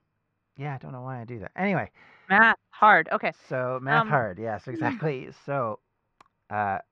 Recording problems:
muffled; very; fading above 2 kHz

